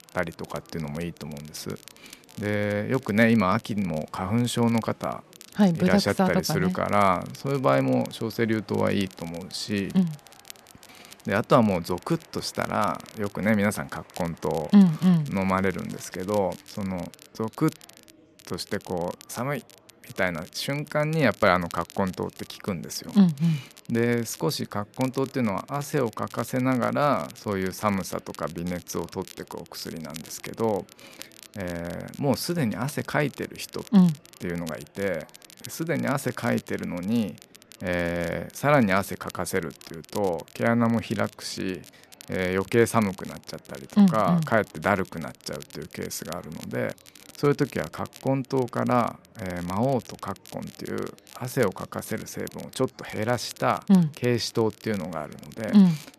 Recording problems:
murmuring crowd; faint; throughout; 30 dB below the speech
crackle, like an old record; faint; 20 dB below the speech

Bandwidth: 13.5 kHz